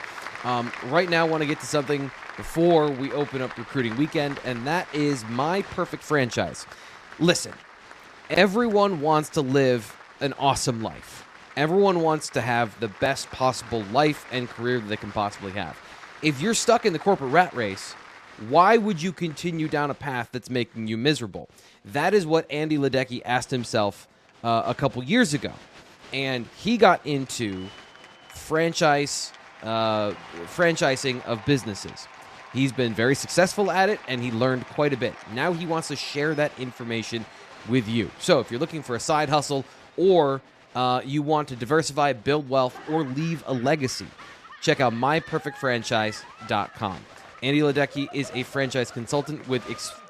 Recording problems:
crowd noise; noticeable; throughout; 20 dB below the speech

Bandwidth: 14.5 kHz